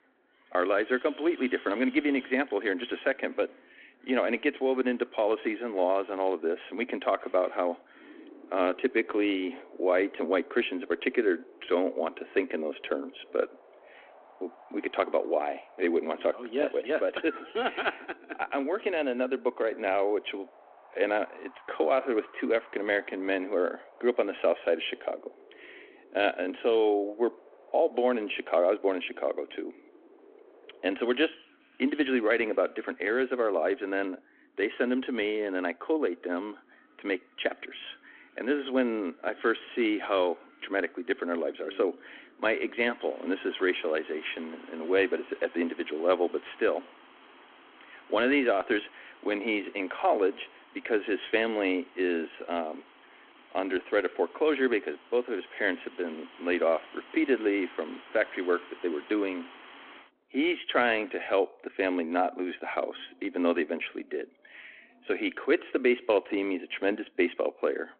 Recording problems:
phone-call audio
wind in the background; faint; throughout; 25 dB below the speech

